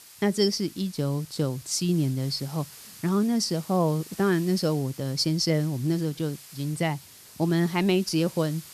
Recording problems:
hiss; noticeable; throughout; 20 dB below the speech

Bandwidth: 14 kHz